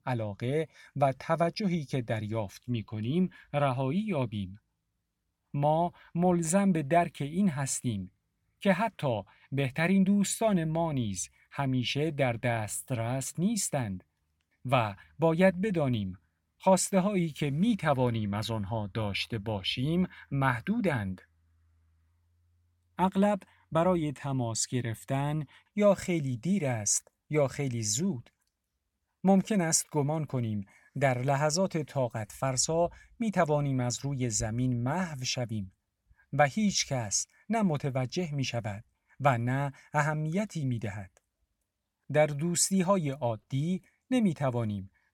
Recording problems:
none

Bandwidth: 17 kHz